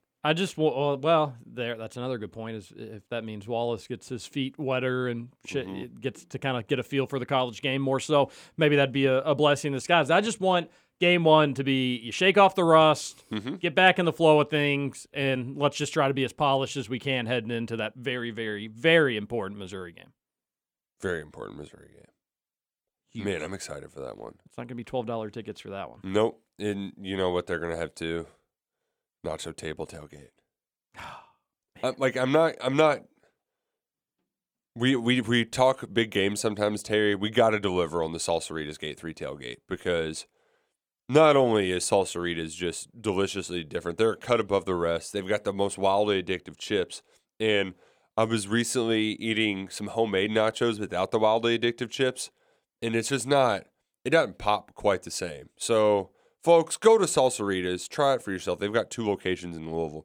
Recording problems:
none

